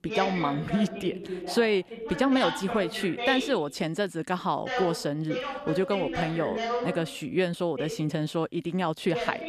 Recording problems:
voice in the background; loud; throughout; 5 dB below the speech

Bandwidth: 14.5 kHz